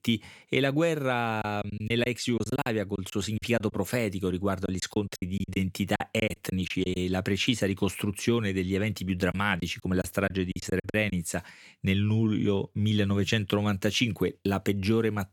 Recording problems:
choppy; very; from 1.5 to 3.5 s, from 4.5 to 7 s and from 9.5 to 11 s; 16% of the speech affected

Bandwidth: 18 kHz